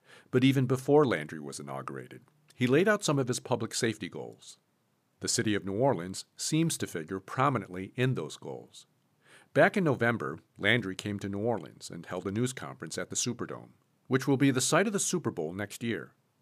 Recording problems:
none

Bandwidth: 15 kHz